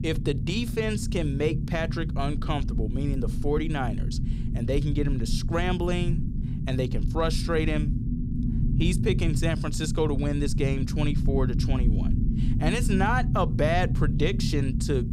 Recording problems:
low rumble; loud; throughout; 9 dB below the speech

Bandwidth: 15.5 kHz